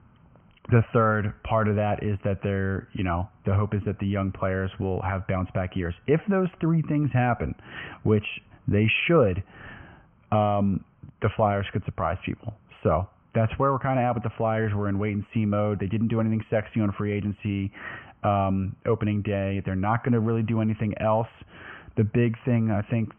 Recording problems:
high frequencies cut off; severe; nothing above 3 kHz

